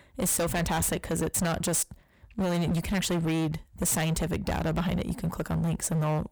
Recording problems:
distortion; heavy; 22% of the sound clipped

